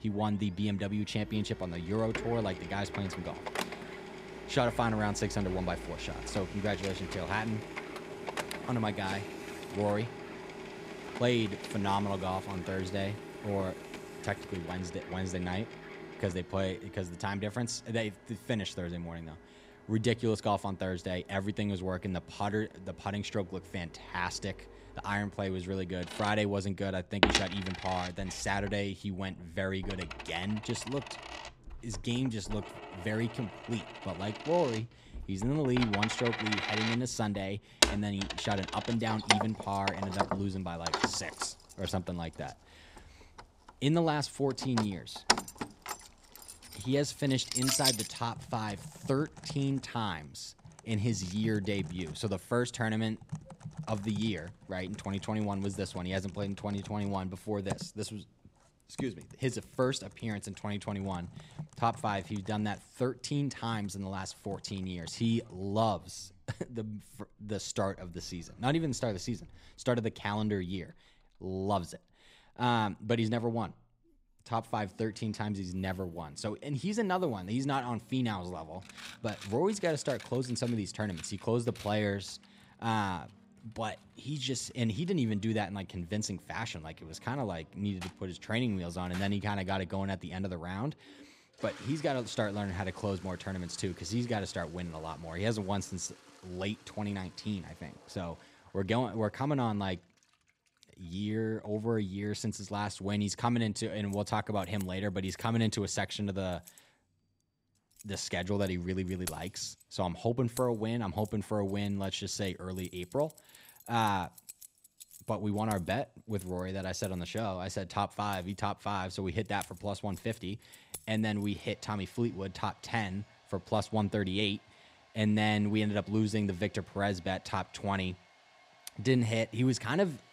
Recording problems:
household noises; loud; throughout; 5 dB below the speech

